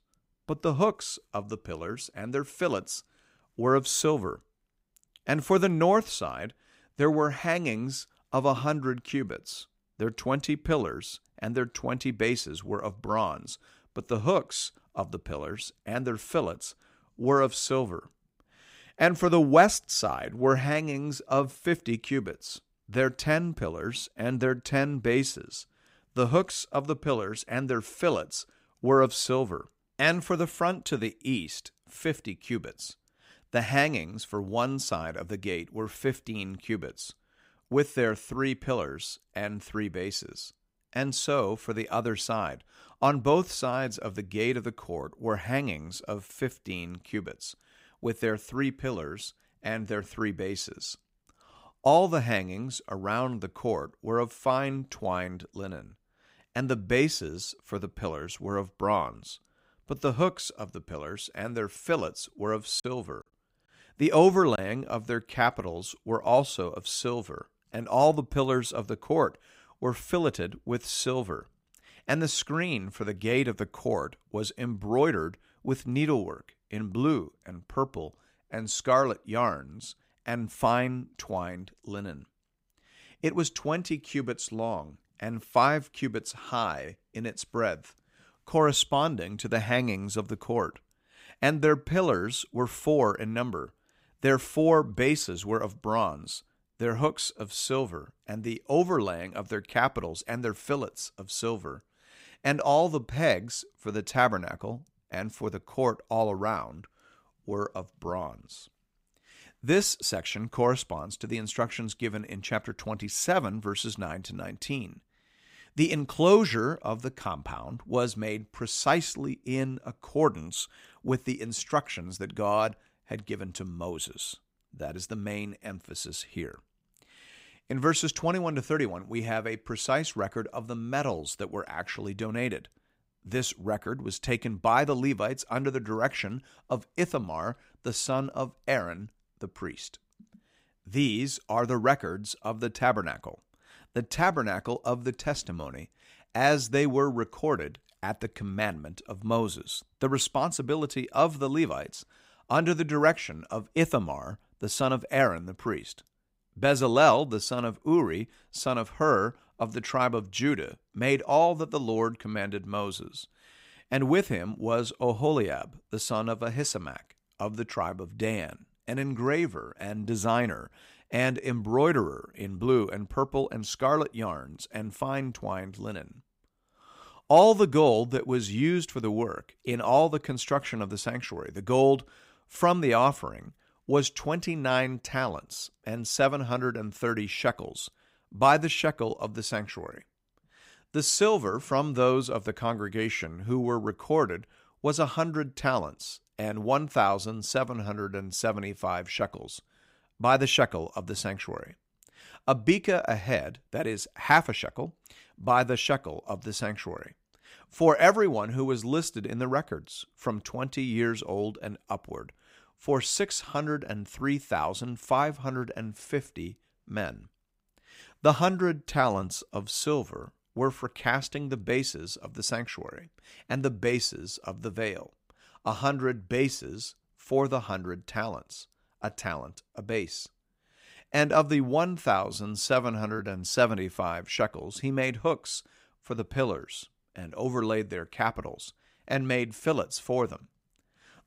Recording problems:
choppy; very; from 1:03 to 1:05; 6% of the speech affected

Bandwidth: 15.5 kHz